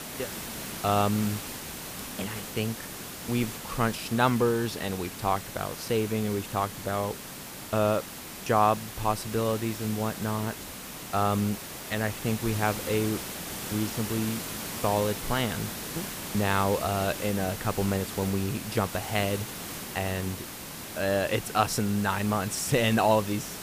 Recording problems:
hiss; loud; throughout; 8 dB below the speech

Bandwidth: 15 kHz